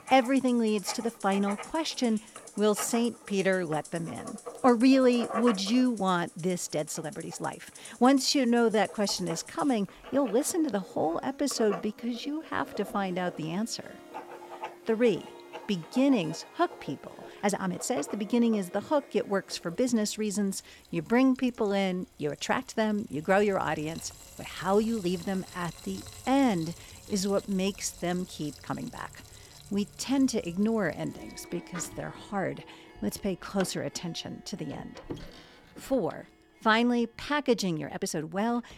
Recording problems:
household noises; noticeable; throughout; 15 dB below the speech
background music; faint; throughout; 20 dB below the speech
uneven, jittery; strongly; from 2.5 to 38 s

